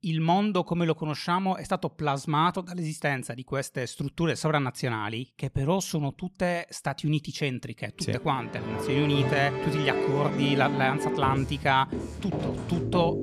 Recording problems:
background music; loud; from 8.5 s on; 3 dB below the speech

